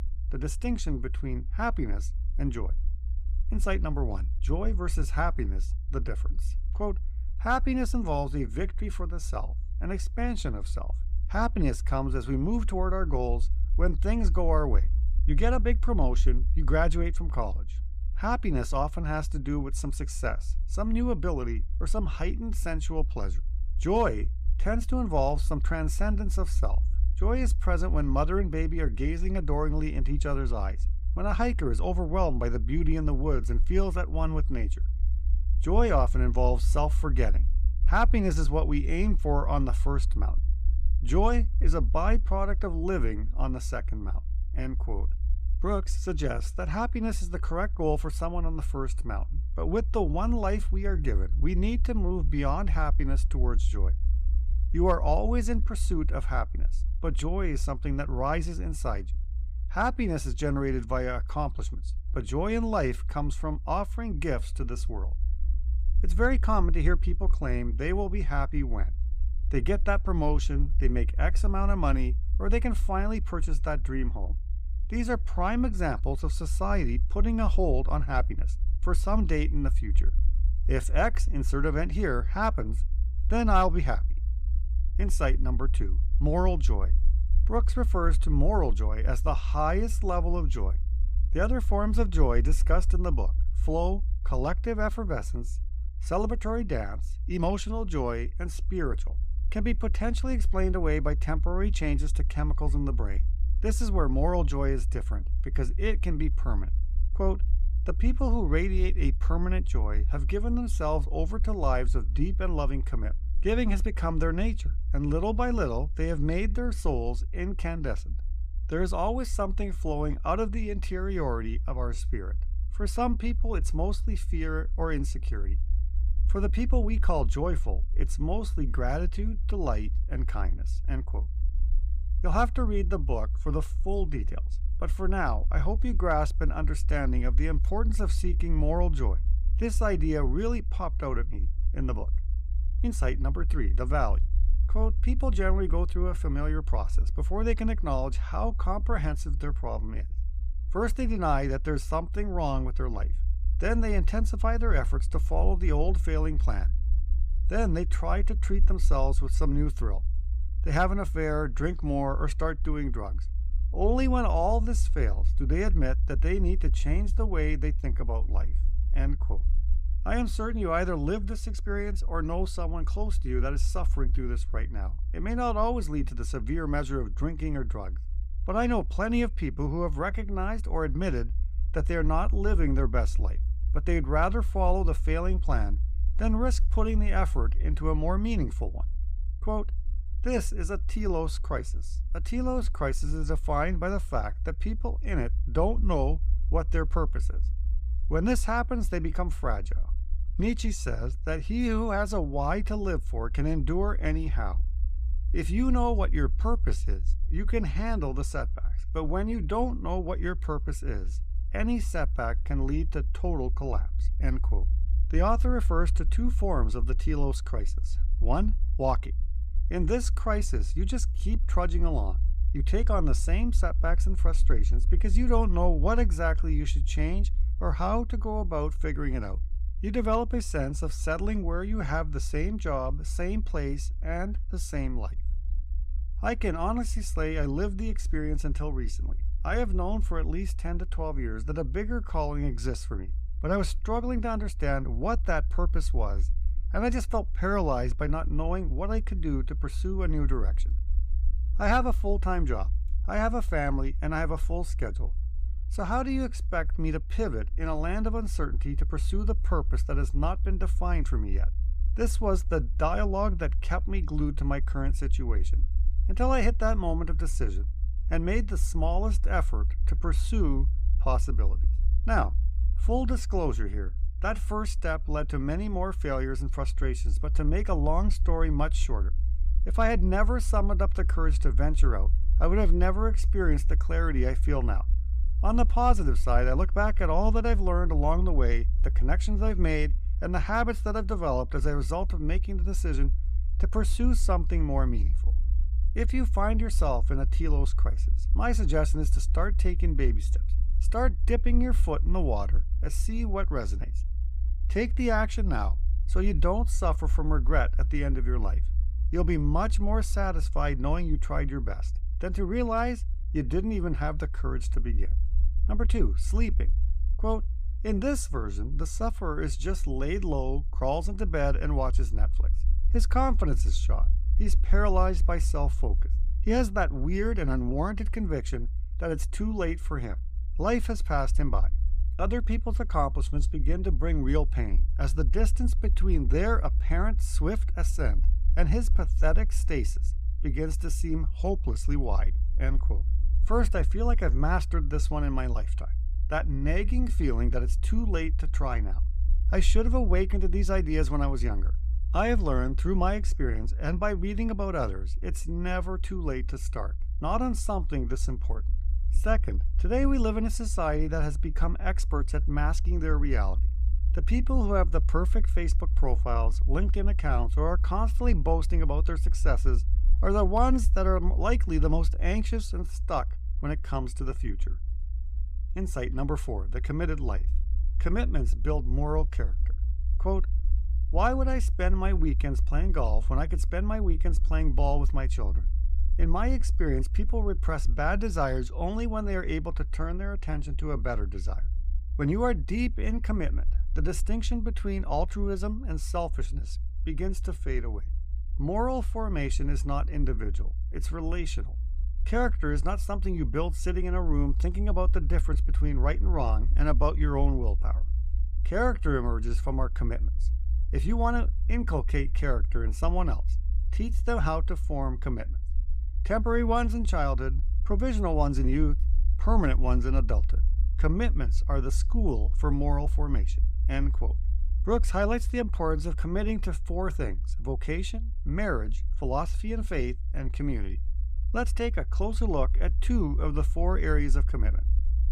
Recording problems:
low rumble; noticeable; throughout; 20 dB below the speech

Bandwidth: 15.5 kHz